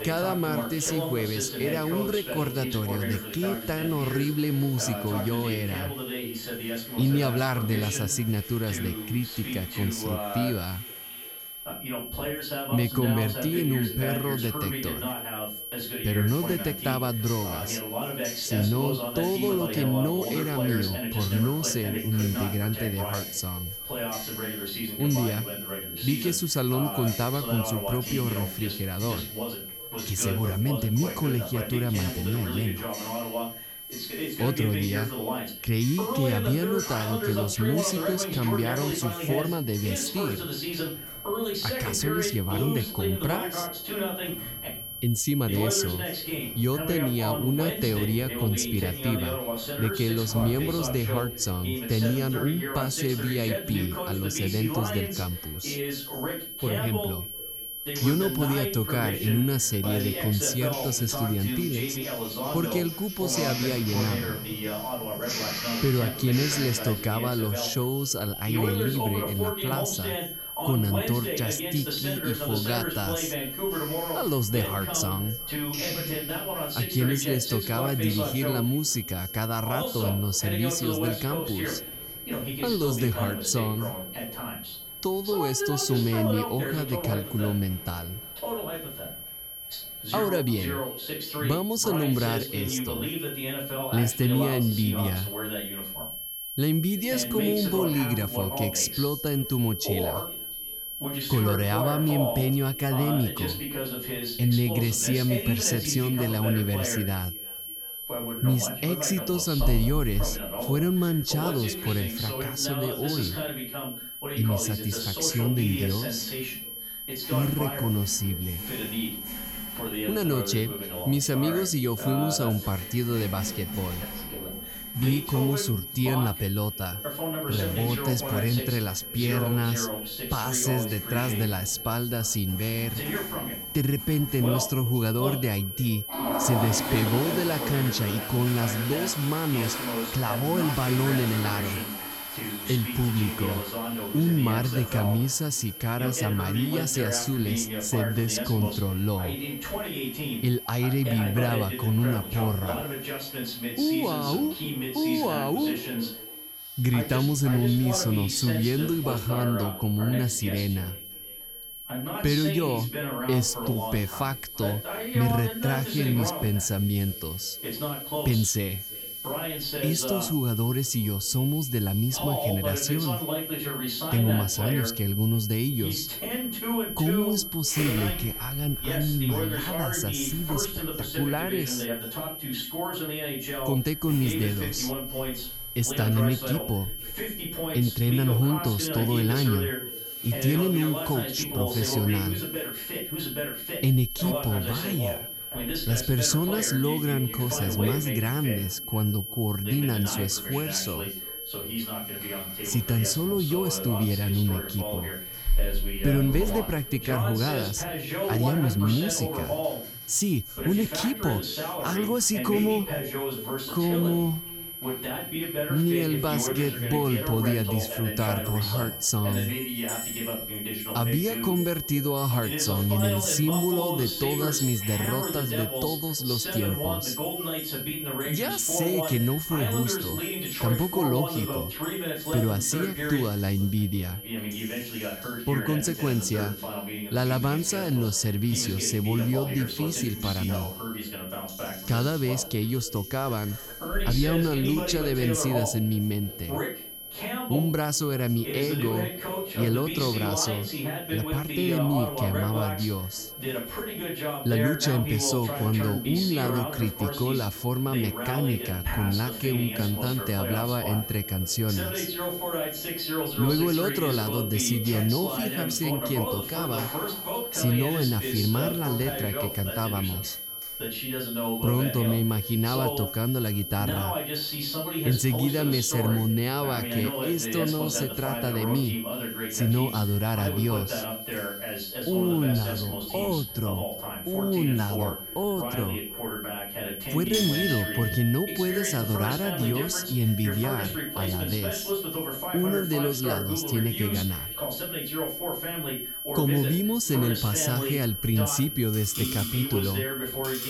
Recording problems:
echo of what is said; faint; throughout; 340 ms later, 20 dB below the speech
high-pitched whine; loud; throughout; 11.5 kHz, 8 dB below the speech
voice in the background; loud; throughout; 6 dB below the speech
household noises; noticeable; throughout; 15 dB below the speech

